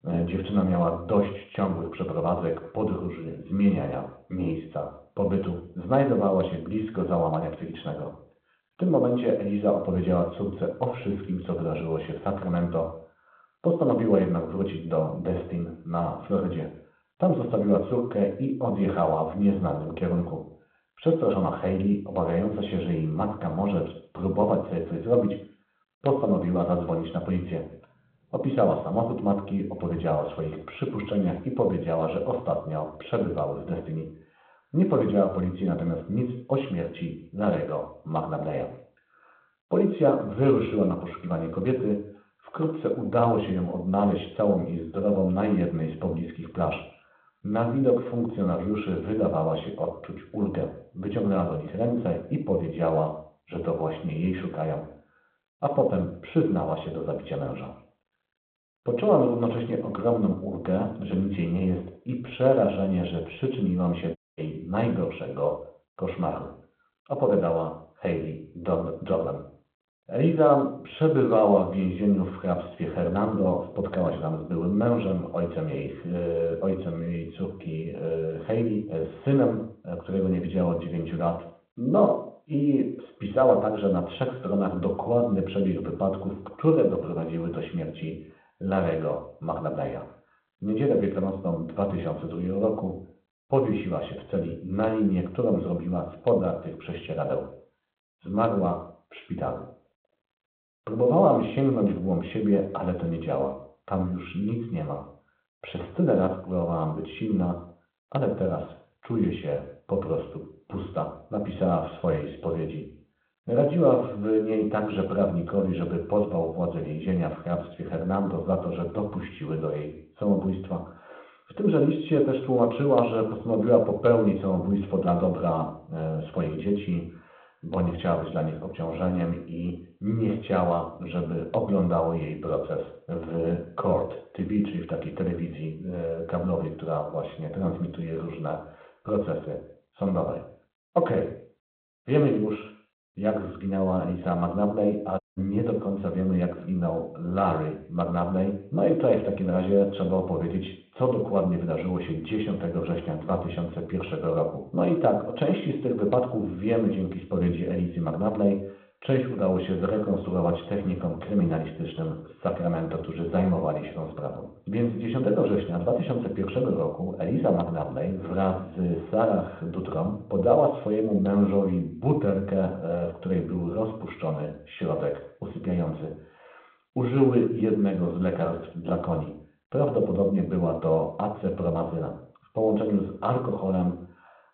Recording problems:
muffled; very; fading above 1.5 kHz
room echo; slight; dies away in 0.5 s
phone-call audio
off-mic speech; somewhat distant
audio cutting out; at 1:04 and at 2:25

